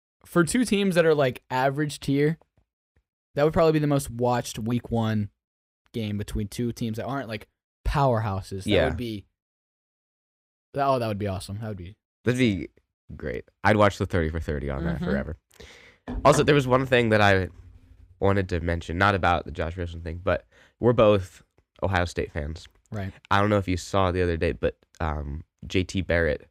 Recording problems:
none

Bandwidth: 15.5 kHz